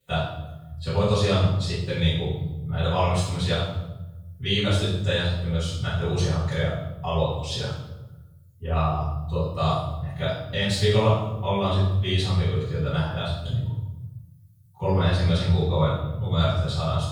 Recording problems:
room echo; strong; dies away in 1 s
off-mic speech; far

